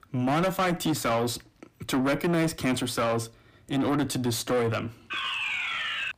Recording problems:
distortion; heavy; 7 dB below the speech
alarm; noticeable; from 5 s on; peak level with the speech

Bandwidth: 15 kHz